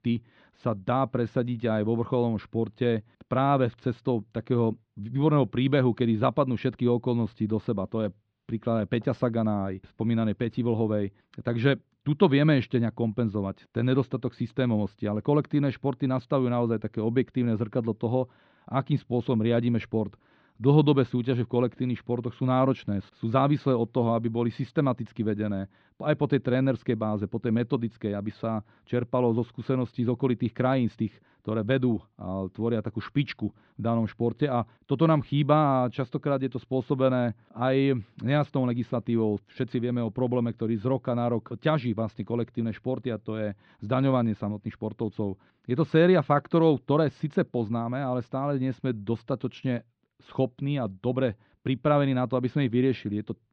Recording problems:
muffled; slightly; fading above 4 kHz

